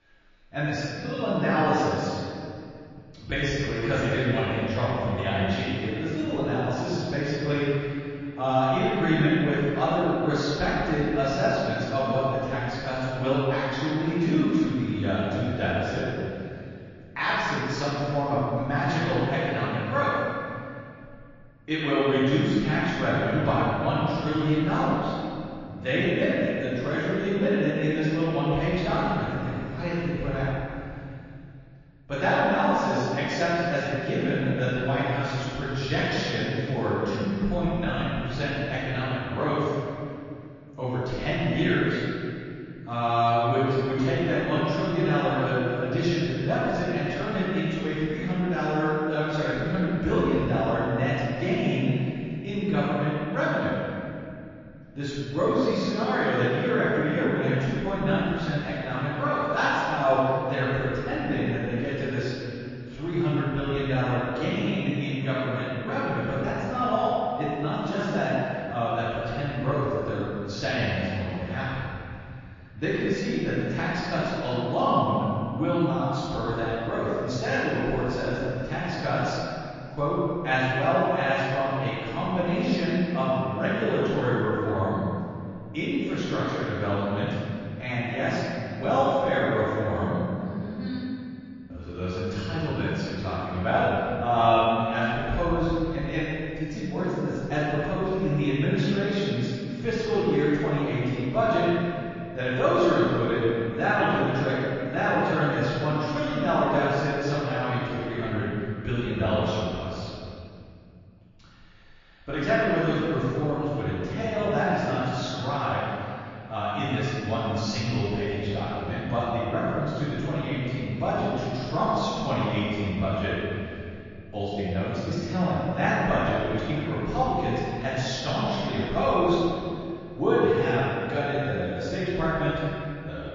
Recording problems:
room echo; strong; dies away in 2.4 s
off-mic speech; far
garbled, watery; slightly; nothing above 6.5 kHz

